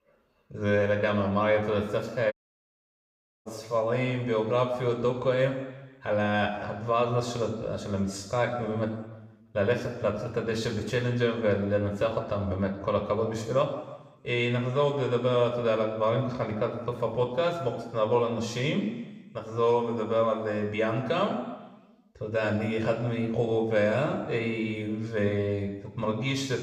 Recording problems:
room echo; slight; dies away in 1 s
off-mic speech; somewhat distant
audio cutting out; at 2.5 s for 1 s

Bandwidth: 15.5 kHz